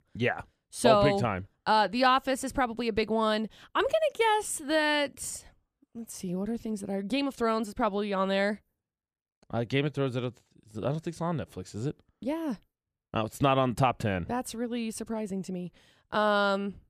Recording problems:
none

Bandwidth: 14.5 kHz